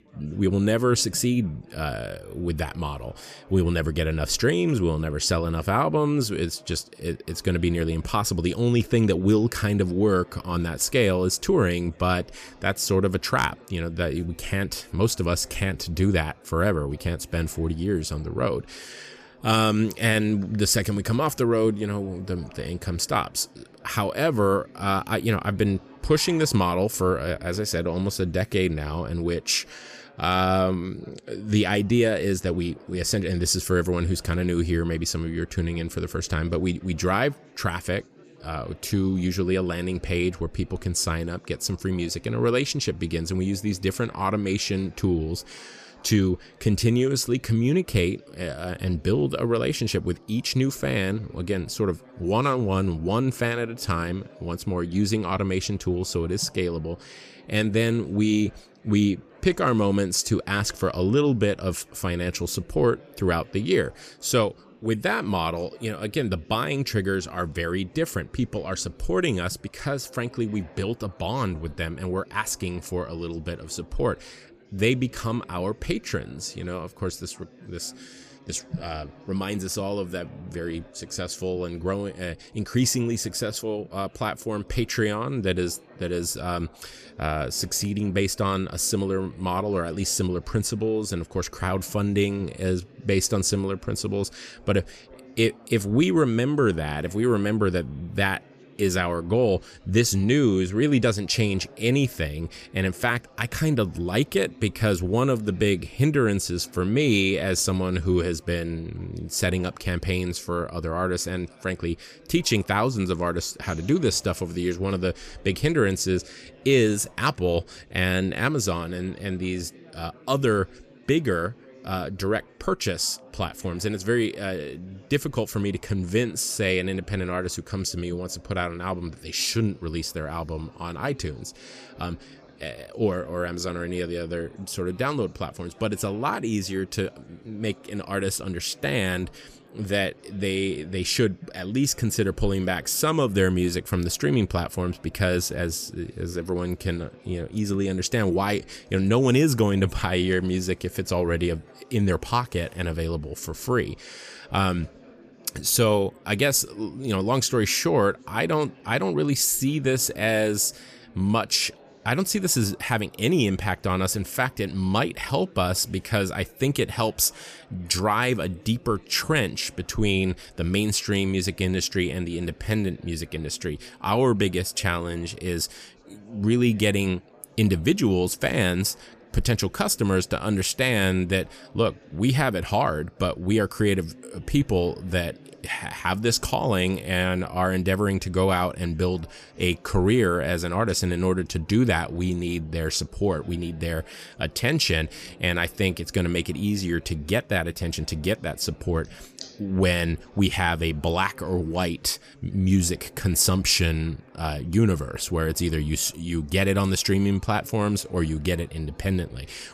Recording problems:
chatter from many people; faint; throughout; 25 dB below the speech

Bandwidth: 14.5 kHz